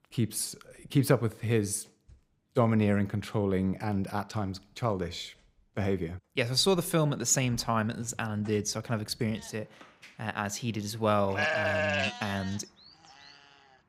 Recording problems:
animal sounds; loud; throughout; 1 dB below the speech

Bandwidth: 15.5 kHz